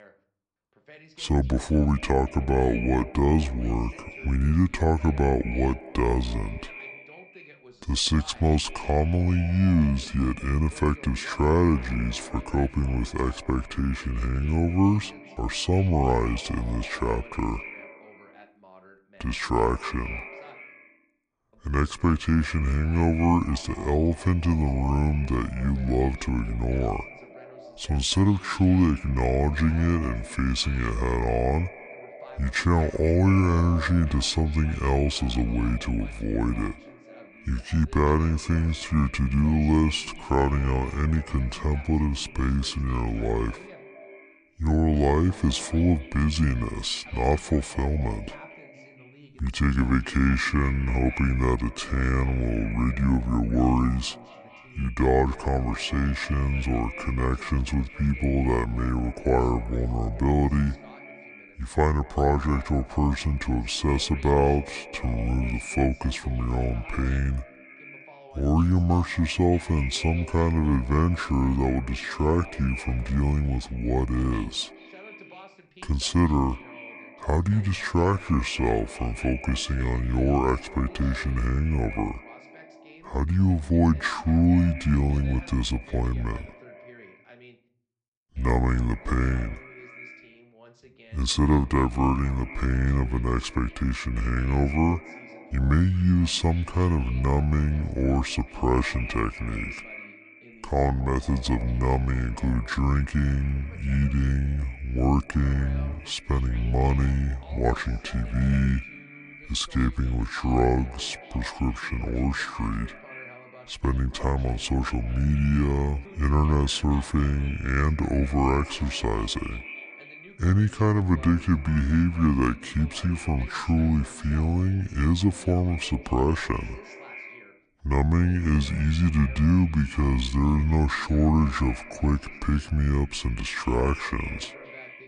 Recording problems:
wrong speed and pitch; too slow and too low; 0.7 times normal speed
echo of what is said; noticeable; throughout; 230 ms later, 15 dB below the speech
voice in the background; faint; throughout; 25 dB below the speech

